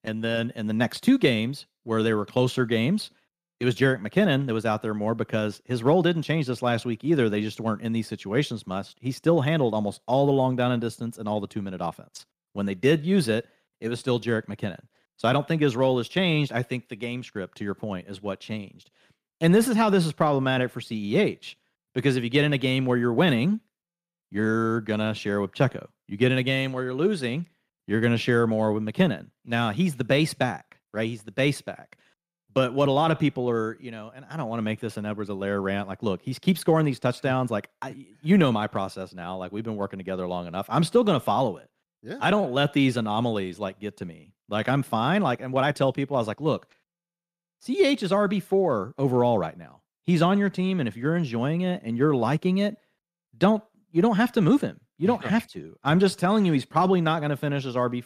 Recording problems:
none

